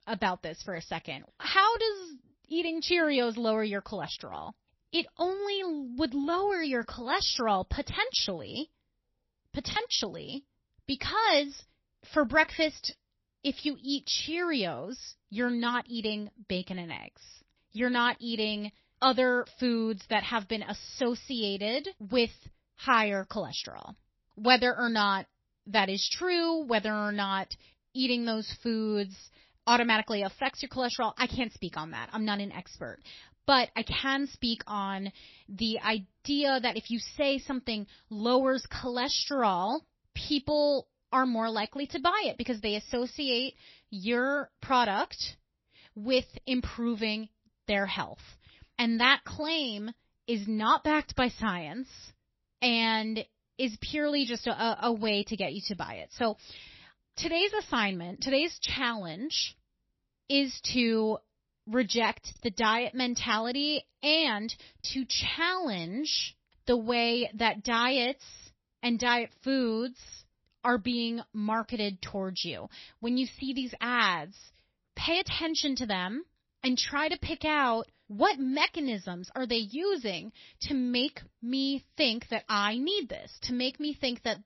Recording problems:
garbled, watery; slightly; nothing above 5.5 kHz
choppy; occasionally; at 9.5 s and at 1:05; 3% of the speech affected

